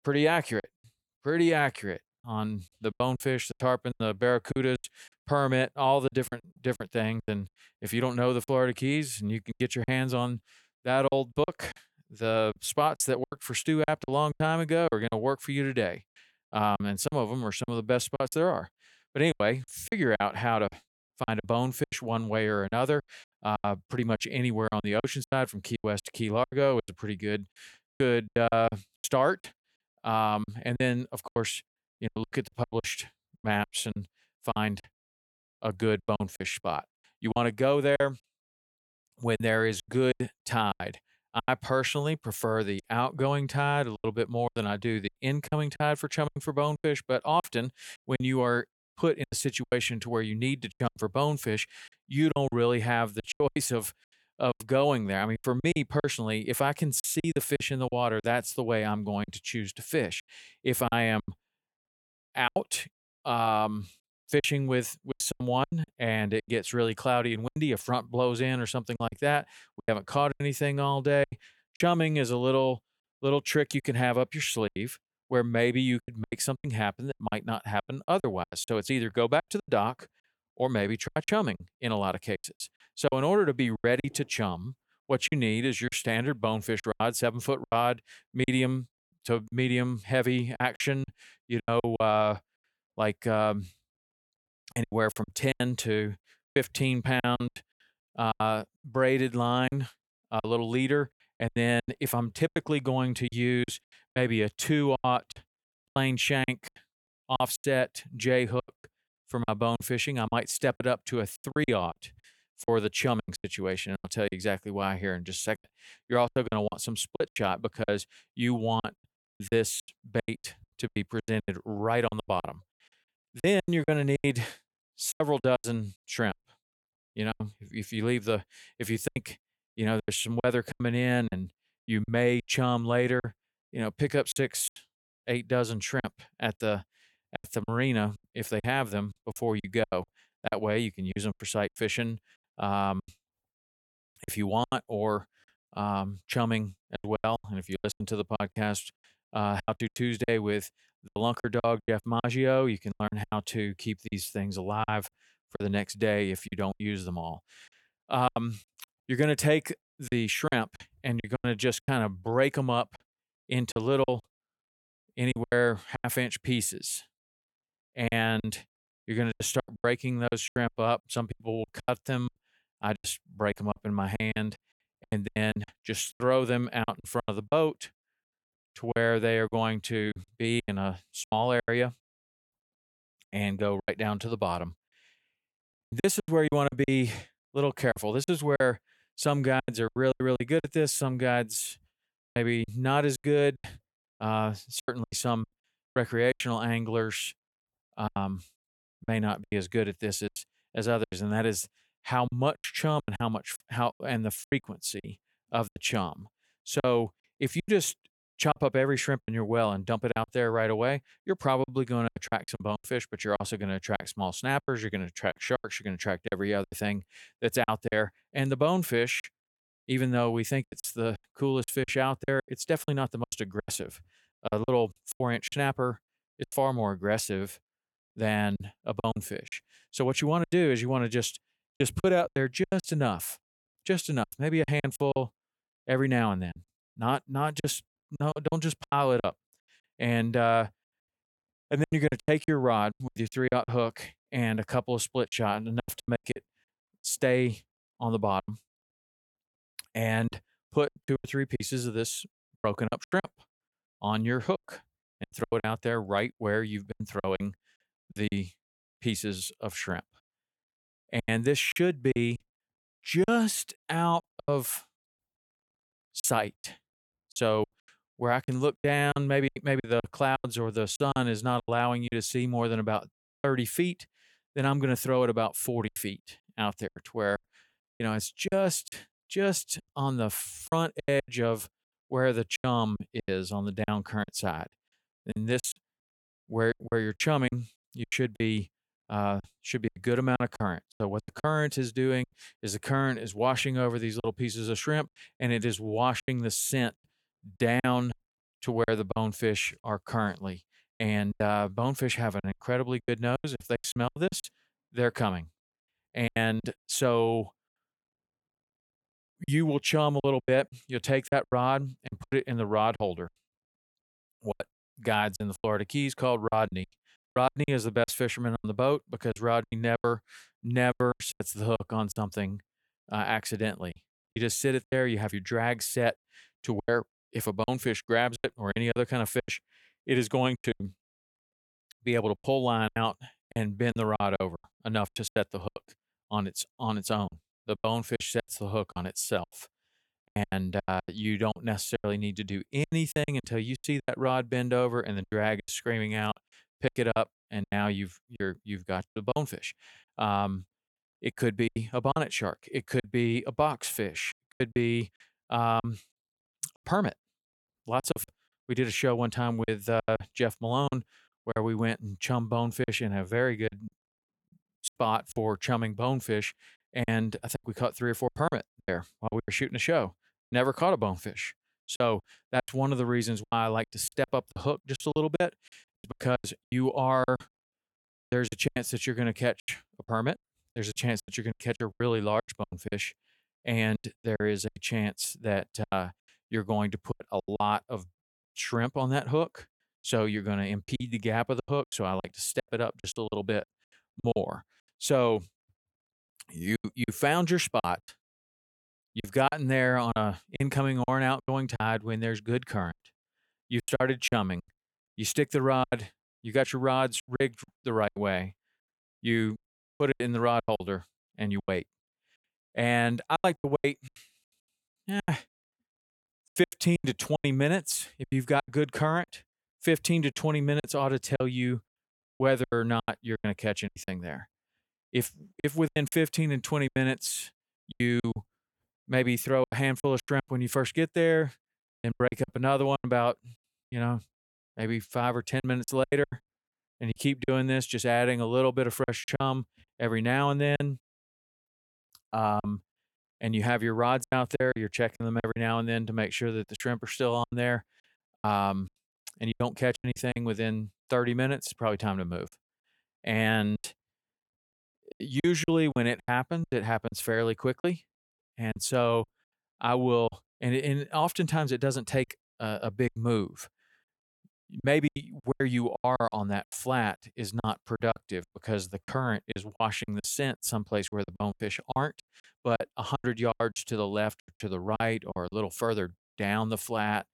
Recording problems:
choppy; very; 13% of the speech affected

